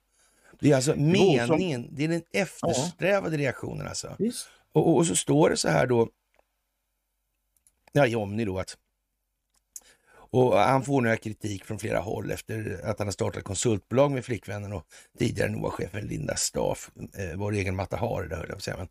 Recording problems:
uneven, jittery; strongly; from 4.5 to 17 s

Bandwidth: 15 kHz